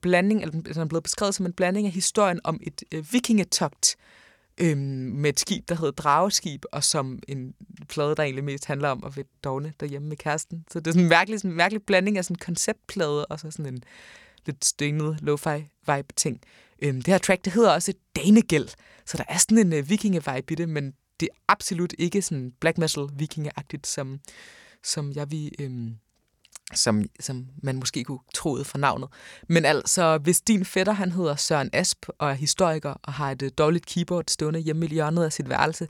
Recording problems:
none

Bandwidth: 18 kHz